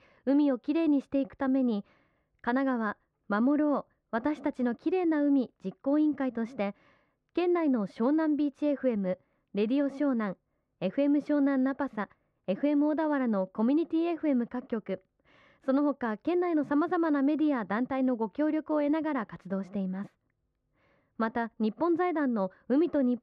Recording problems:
muffled; very; fading above 1.5 kHz

